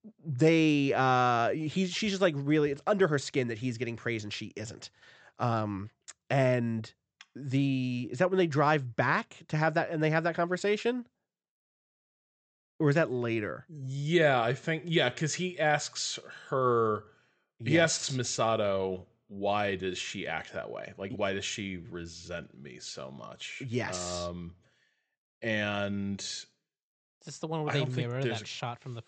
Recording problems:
high frequencies cut off; noticeable; nothing above 8 kHz

